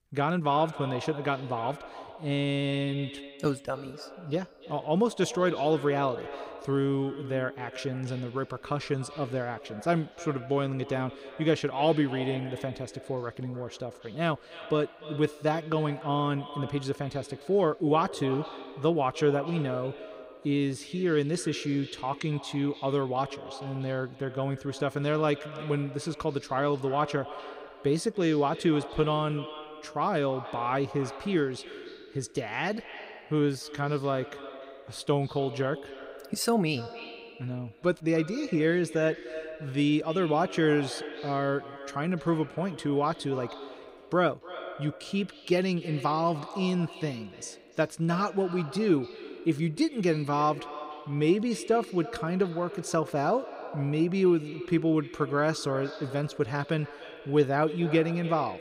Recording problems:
echo of what is said; noticeable; throughout; 300 ms later, 15 dB below the speech

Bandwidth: 15.5 kHz